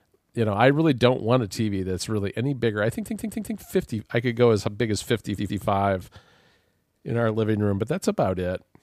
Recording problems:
audio stuttering; at 3 s and at 5.5 s

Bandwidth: 15 kHz